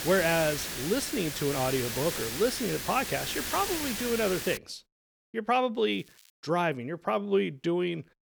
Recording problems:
hiss; loud; until 4.5 s; 4 dB below the speech
crackling; very faint; from 1.5 to 4 s and at 6 s; 25 dB below the speech

